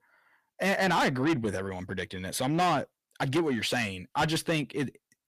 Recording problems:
distortion; heavy; 6 dB below the speech

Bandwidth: 15 kHz